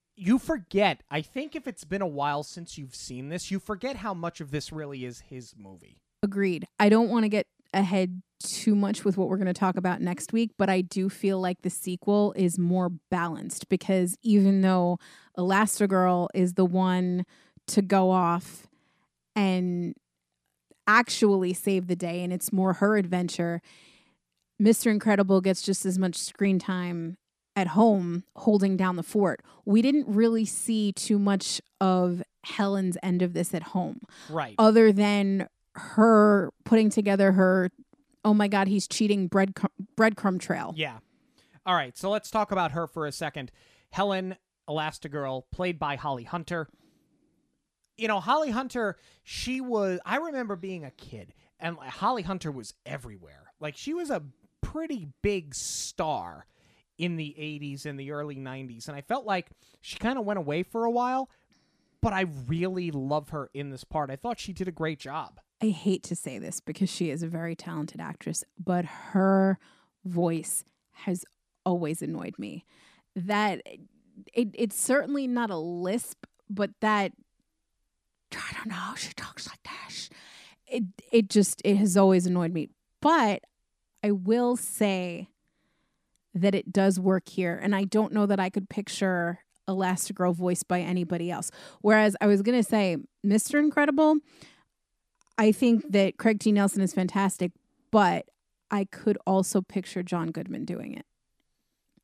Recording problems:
none

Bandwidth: 14.5 kHz